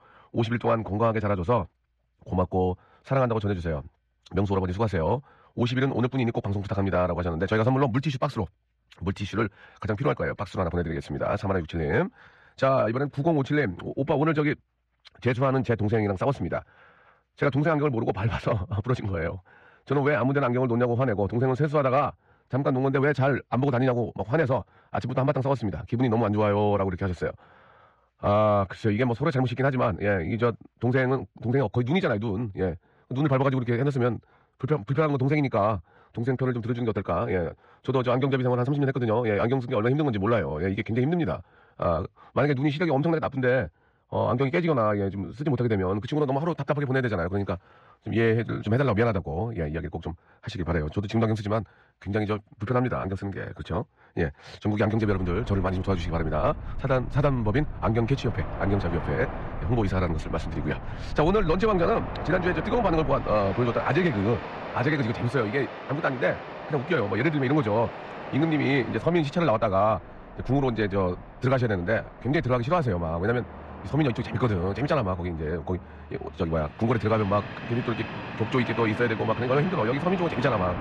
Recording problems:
wrong speed, natural pitch; too fast; 1.5 times normal speed
muffled; slightly; fading above 2.5 kHz
train or aircraft noise; noticeable; from 55 s on; 10 dB below the speech

